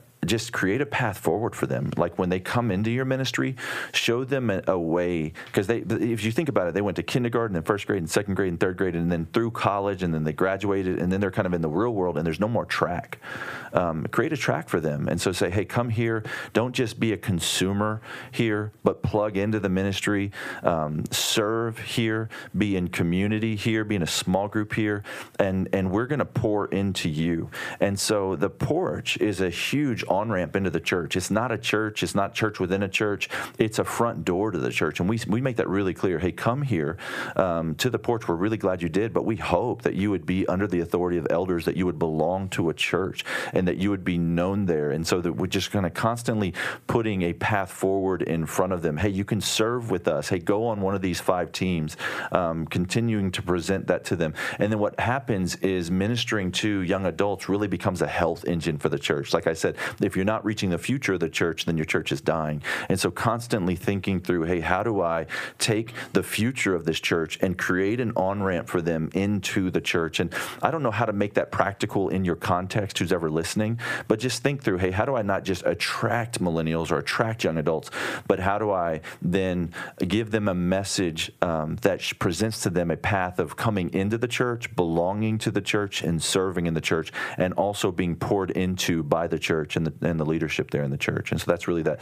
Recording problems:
squashed, flat; heavily

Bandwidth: 15 kHz